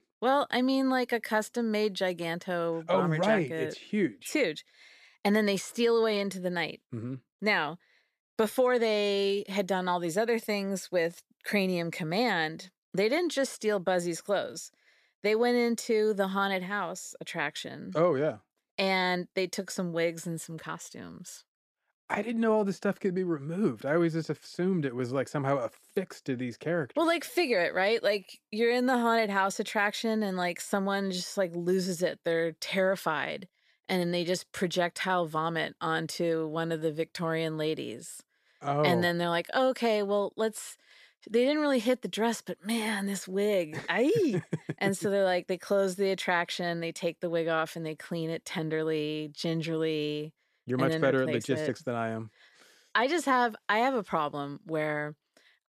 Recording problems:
none

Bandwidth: 14.5 kHz